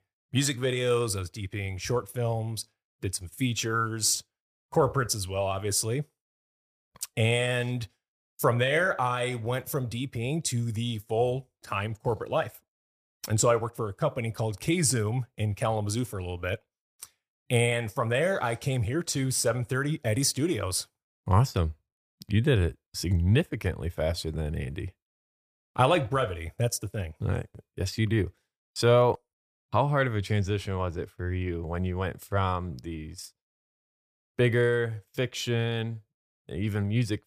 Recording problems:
none

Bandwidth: 15 kHz